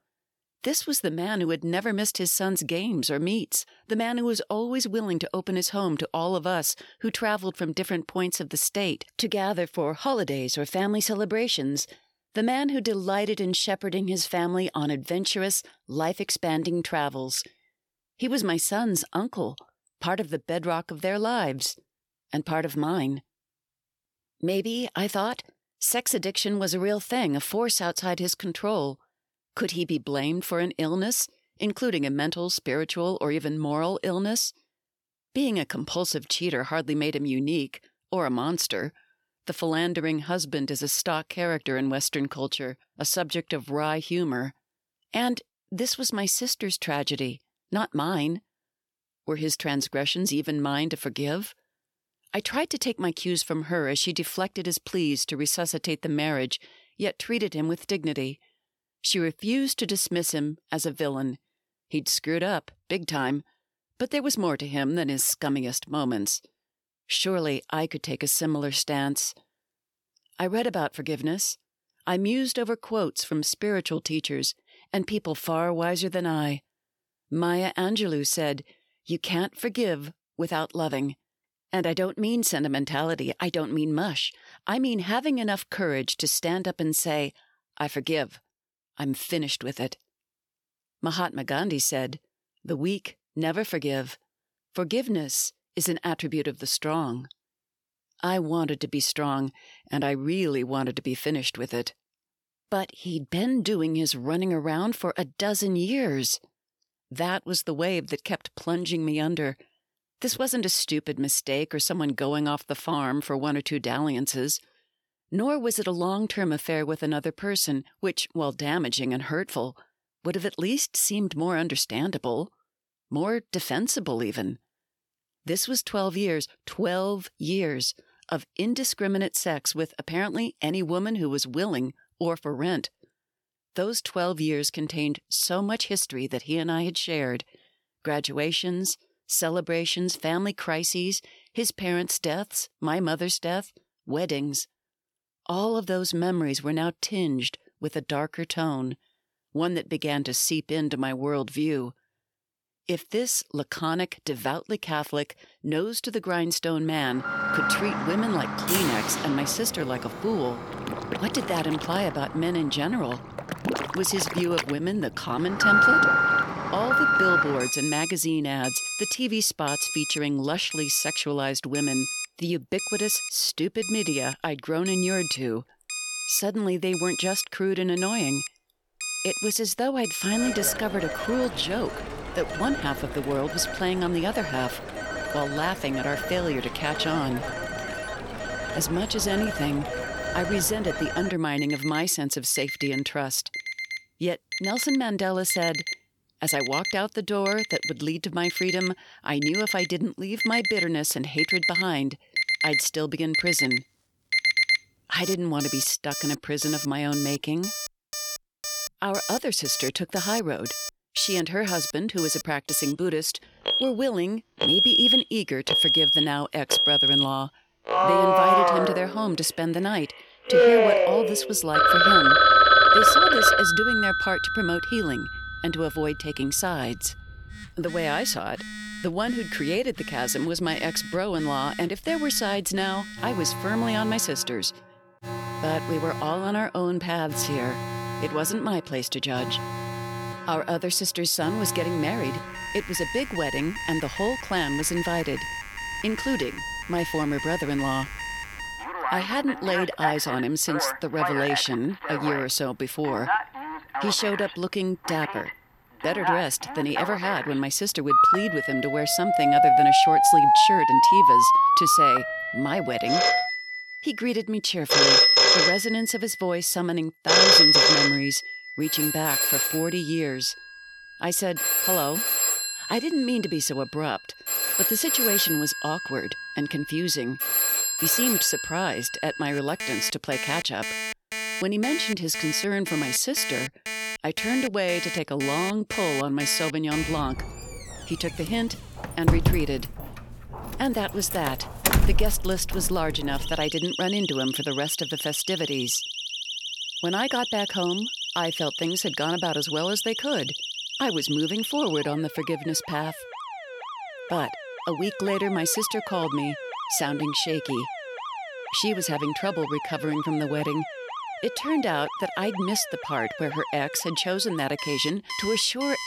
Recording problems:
alarms or sirens; very loud; from 2:37 on; 3 dB above the speech

